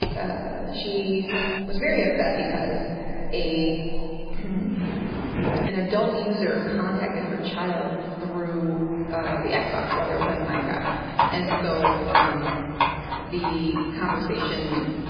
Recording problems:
off-mic speech; far
garbled, watery; badly; nothing above 4 kHz
echo of what is said; noticeable; throughout; 560 ms later, 20 dB below the speech
room echo; noticeable; dies away in 2.1 s
animal sounds; loud; throughout; as loud as the speech
keyboard typing; noticeable; at the start; peak 4 dB below the speech
clattering dishes; noticeable; at 1.5 s; peak level with the speech
footsteps; loud; at 4.5 s; peak 2 dB above the speech

